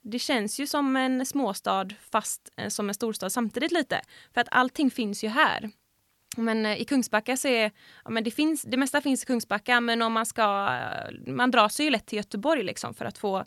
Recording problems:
none

